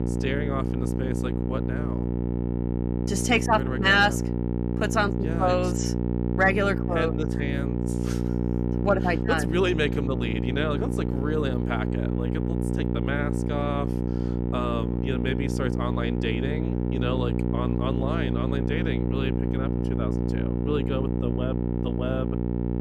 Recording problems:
electrical hum; loud; throughout; 60 Hz, 6 dB below the speech

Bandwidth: 14 kHz